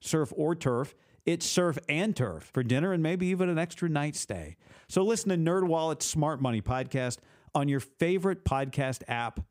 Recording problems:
none

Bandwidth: 15.5 kHz